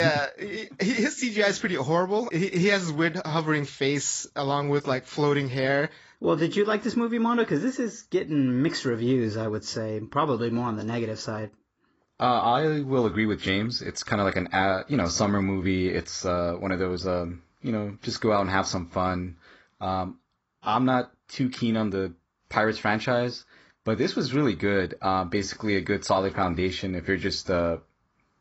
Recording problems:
garbled, watery; badly; nothing above 7.5 kHz
abrupt cut into speech; at the start

